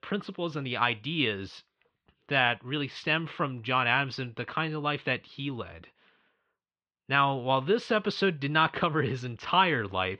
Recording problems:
muffled; very; fading above 3.5 kHz

